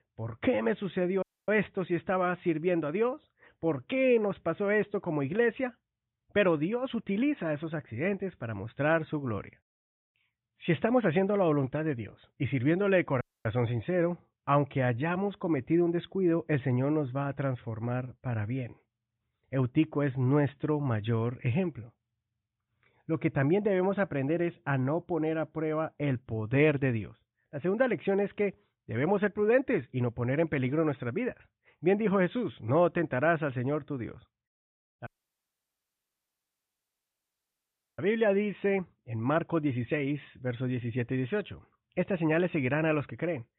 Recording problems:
high frequencies cut off; severe; nothing above 3.5 kHz
audio cutting out; at 1 s, at 13 s and at 35 s for 3 s

